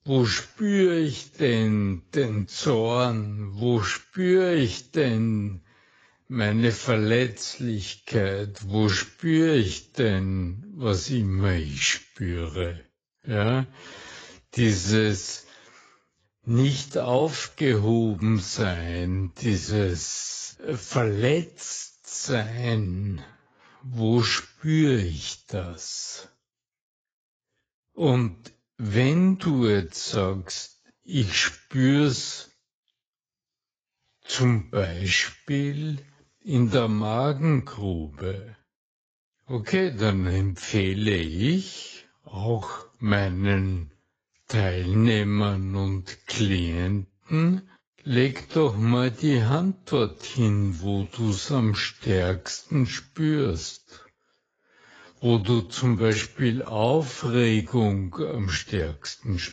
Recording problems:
garbled, watery; badly; nothing above 7.5 kHz
wrong speed, natural pitch; too slow; 0.5 times normal speed

